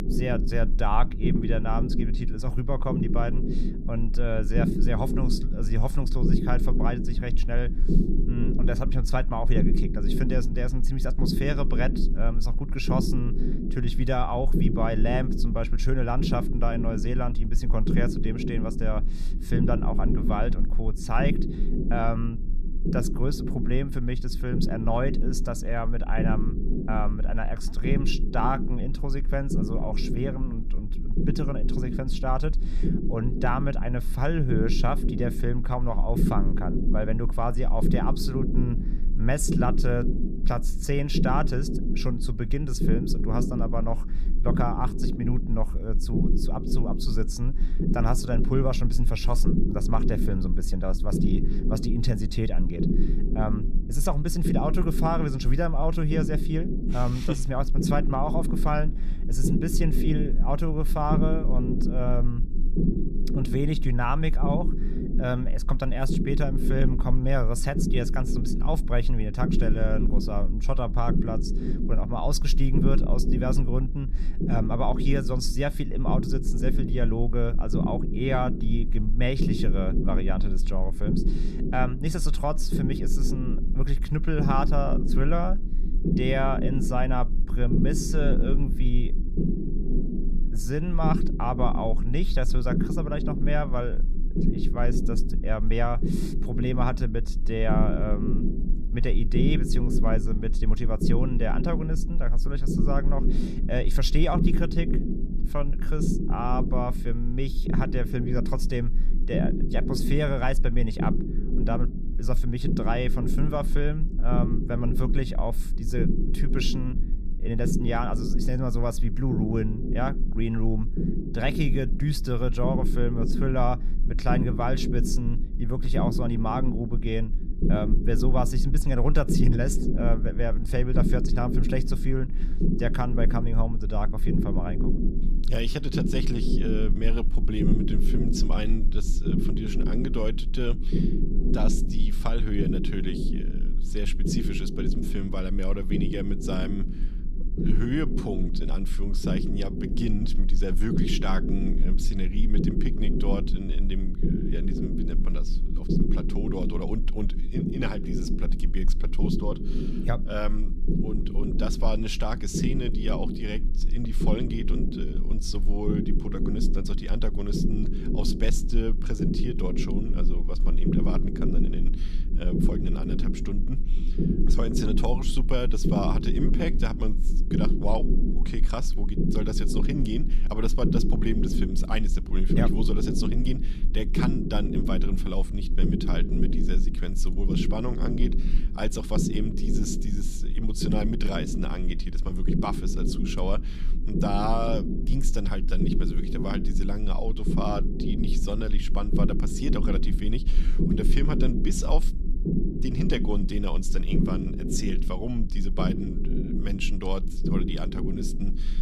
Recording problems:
low rumble; loud; throughout; 5 dB below the speech

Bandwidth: 14.5 kHz